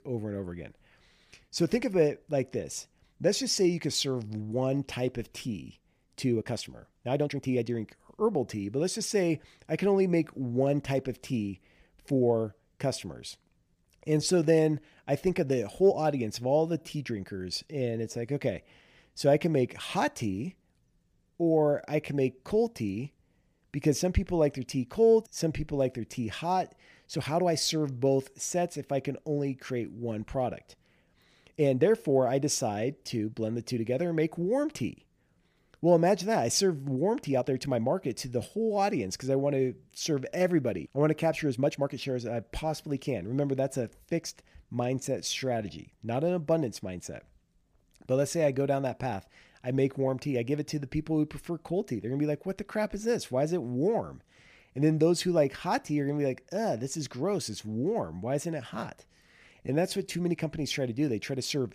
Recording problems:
uneven, jittery; strongly; from 6 s to 1:00

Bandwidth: 15 kHz